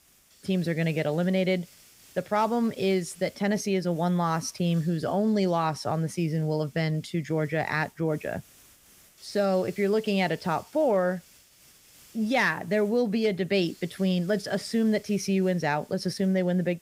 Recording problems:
hiss; faint; throughout; 25 dB below the speech

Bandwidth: 15.5 kHz